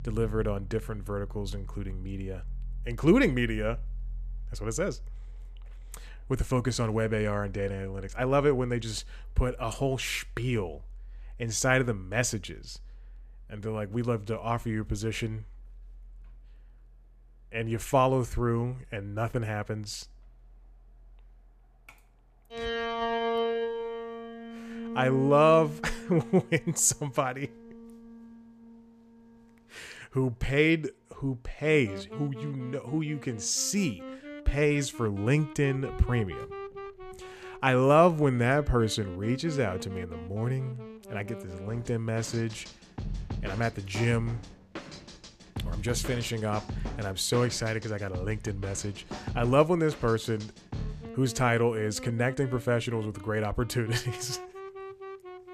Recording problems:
background music; noticeable; throughout; 10 dB below the speech

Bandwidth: 14.5 kHz